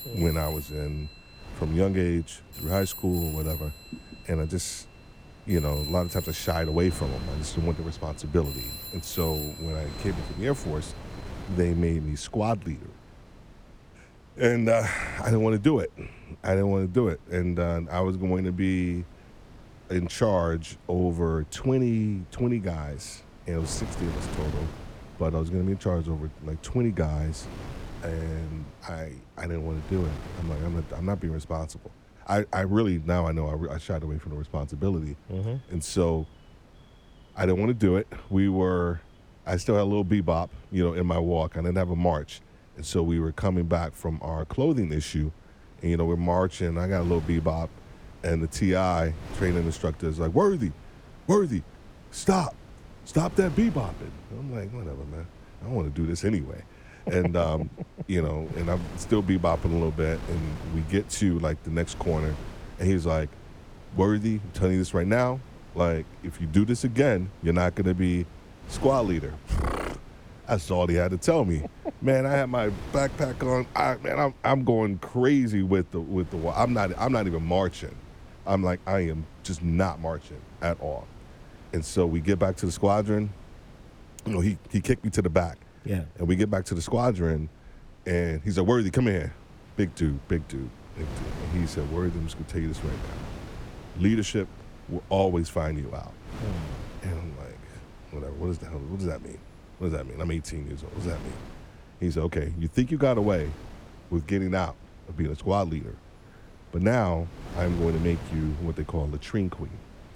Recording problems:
alarms or sirens; noticeable; throughout; 15 dB below the speech
wind noise on the microphone; occasional gusts; 20 dB below the speech

